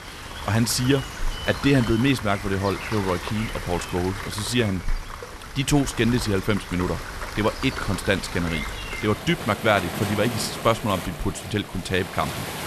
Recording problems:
rain or running water; loud; throughout; 8 dB below the speech

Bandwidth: 13.5 kHz